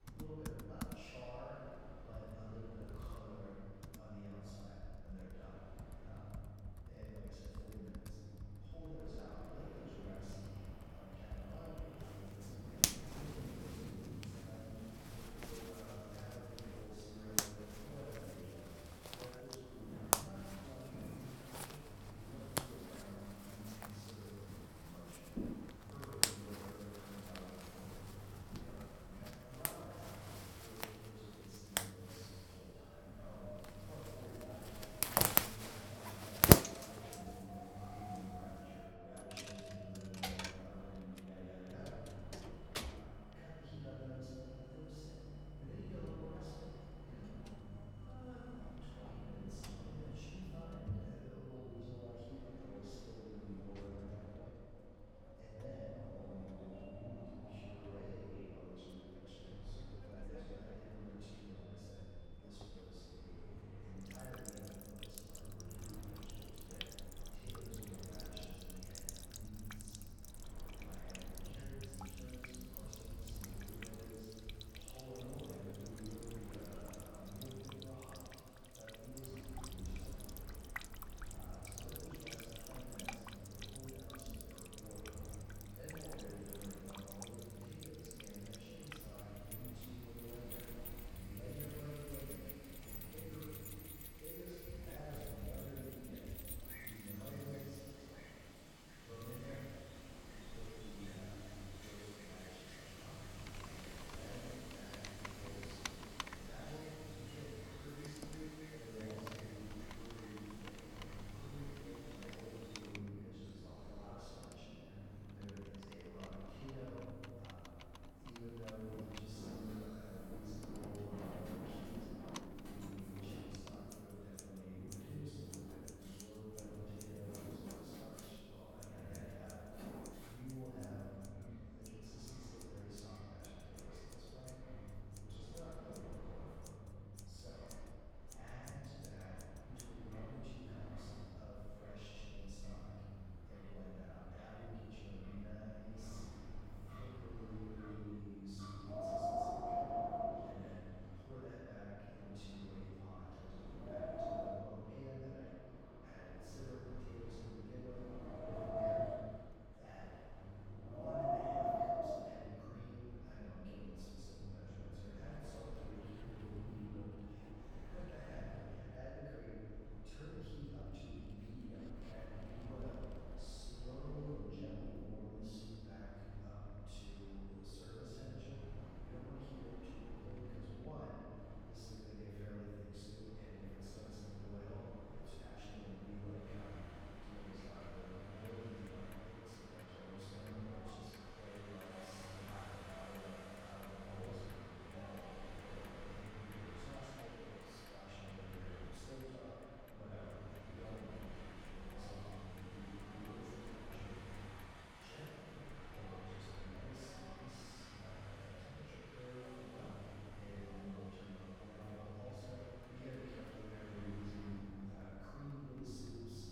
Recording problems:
room echo; strong; dies away in 2.3 s
off-mic speech; far
household noises; very loud; throughout; 9 dB above the speech
wind in the background; loud; throughout; as loud as the speech
low rumble; noticeable; throughout; 15 dB below the speech

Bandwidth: 17 kHz